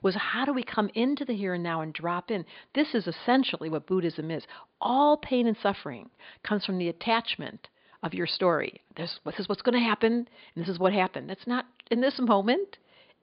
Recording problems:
high frequencies cut off; severe; nothing above 4.5 kHz

